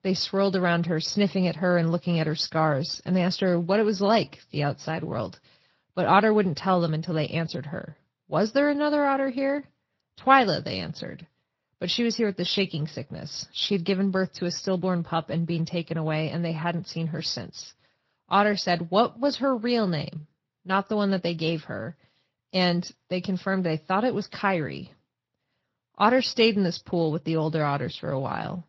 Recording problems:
garbled, watery; slightly

